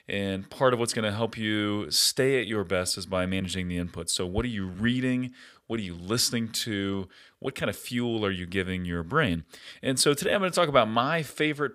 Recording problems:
uneven, jittery; strongly; from 2 to 11 s

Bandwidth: 15 kHz